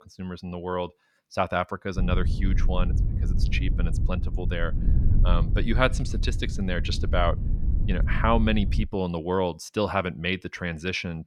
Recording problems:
wind noise on the microphone; occasional gusts; from 2 to 9 s; 15 dB below the speech

